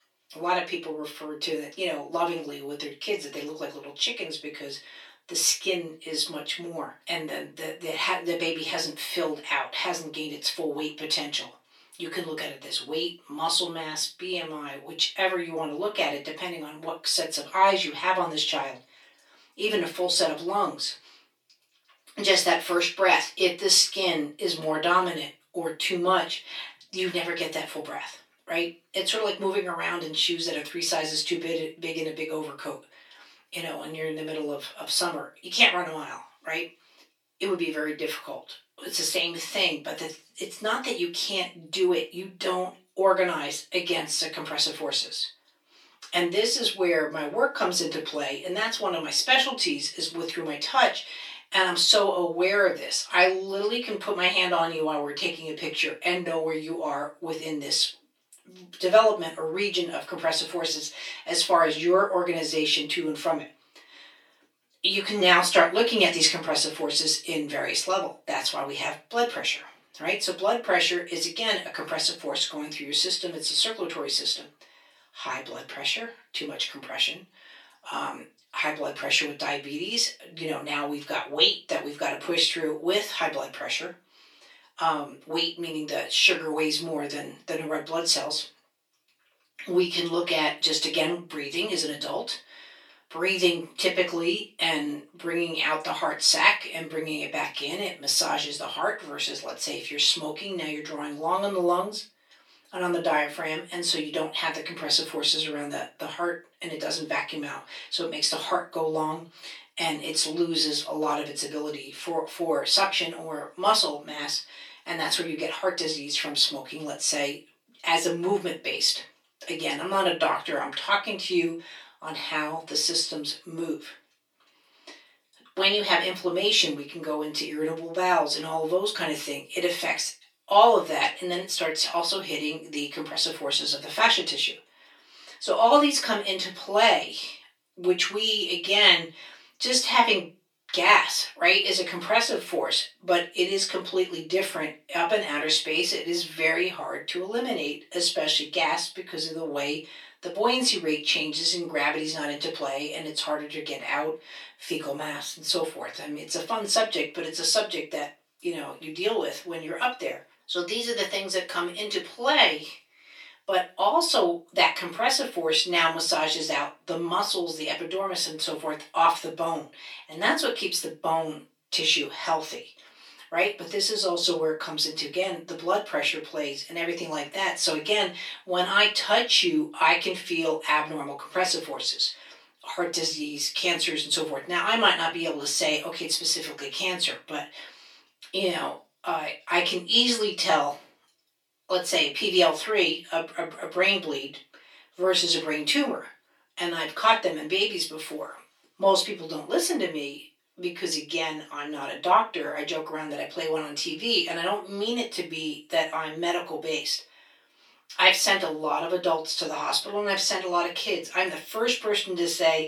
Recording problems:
off-mic speech; far
thin; somewhat; fading below 350 Hz
room echo; very slight; dies away in 0.2 s

